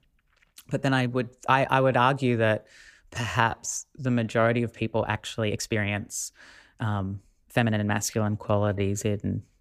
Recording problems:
uneven, jittery; strongly; from 0.5 to 9 s

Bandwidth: 15 kHz